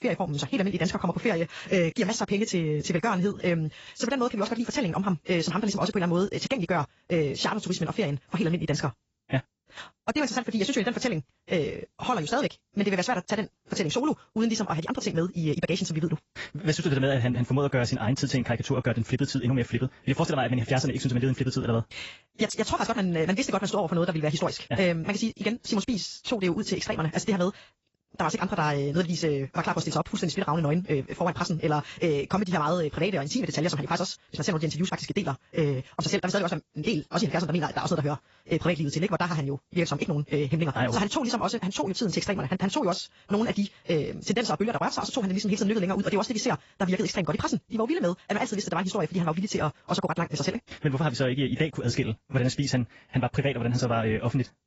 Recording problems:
garbled, watery; badly; nothing above 7.5 kHz
wrong speed, natural pitch; too fast; 1.7 times normal speed

